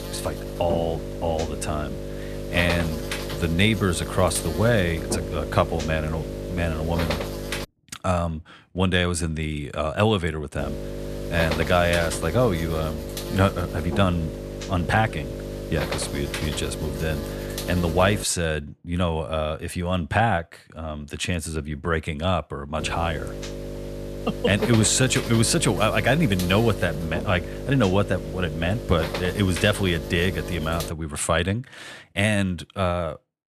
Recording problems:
electrical hum; loud; until 7.5 s, from 11 to 18 s and from 23 to 31 s; 50 Hz, 8 dB below the speech

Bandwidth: 14 kHz